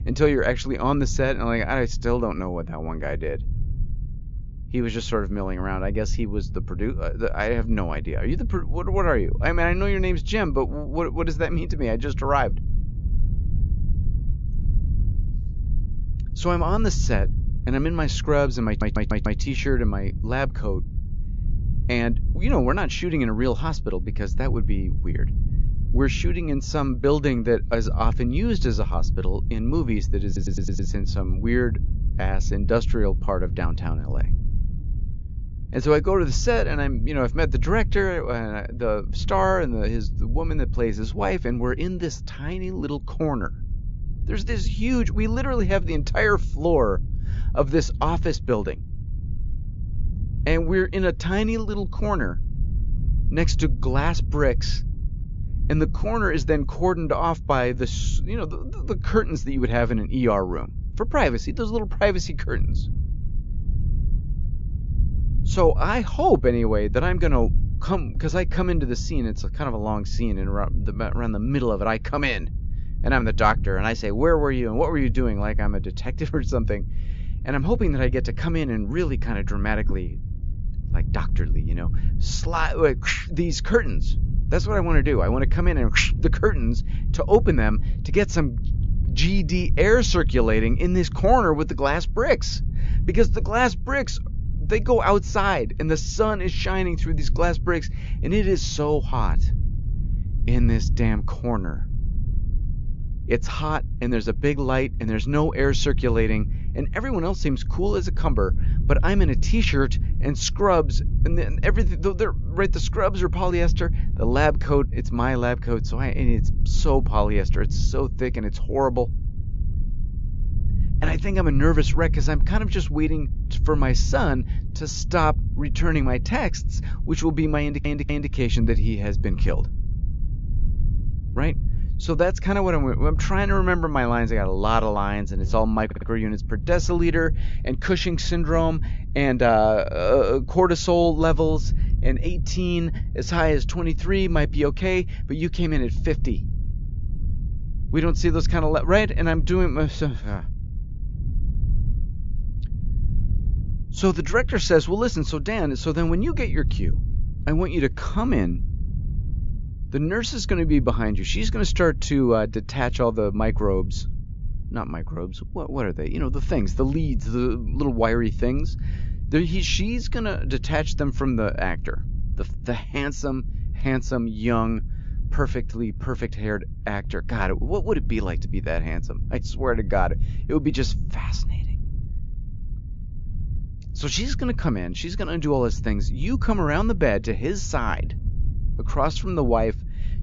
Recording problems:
high frequencies cut off; noticeable; nothing above 7 kHz
low rumble; noticeable; throughout; 20 dB below the speech
audio stuttering; 4 times, first at 19 s

